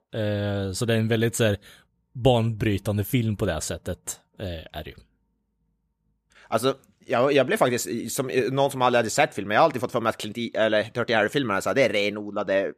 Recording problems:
none

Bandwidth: 14.5 kHz